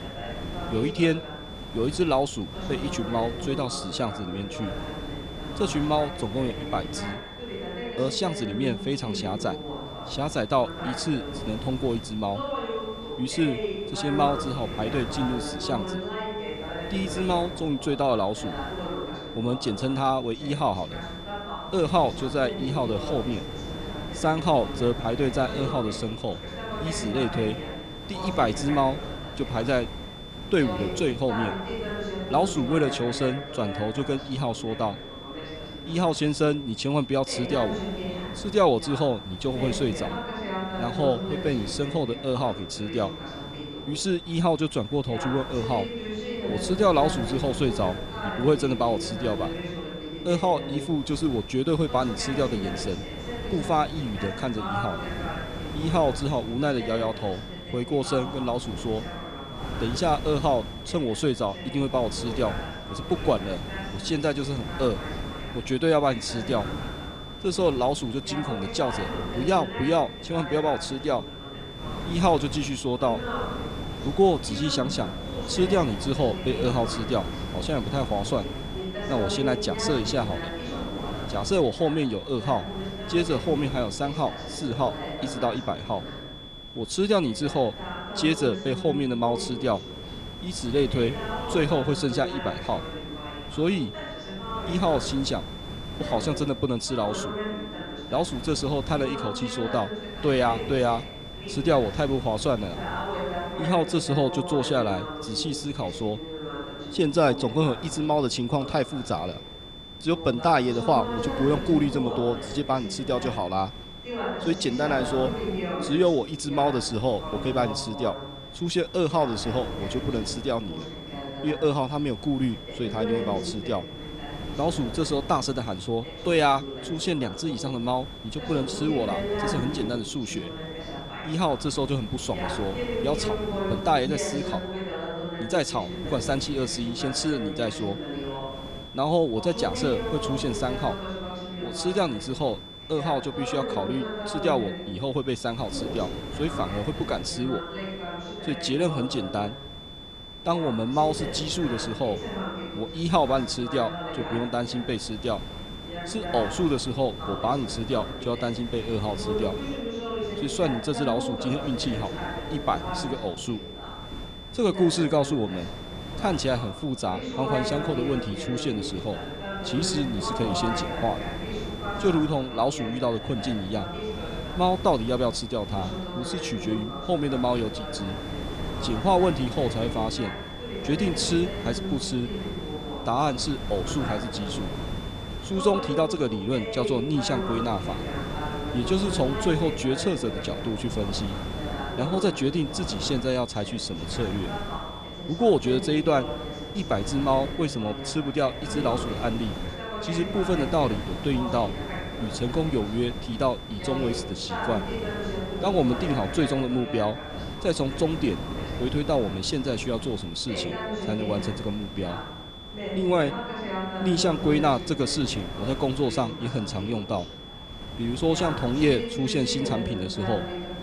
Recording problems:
voice in the background; loud; throughout; 8 dB below the speech
high-pitched whine; noticeable; throughout; 3.5 kHz, 15 dB below the speech
wind noise on the microphone; occasional gusts; 15 dB below the speech

